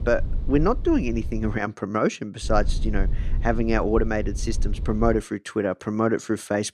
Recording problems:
low rumble; faint; until 1.5 s and from 2.5 to 5 s; 20 dB below the speech

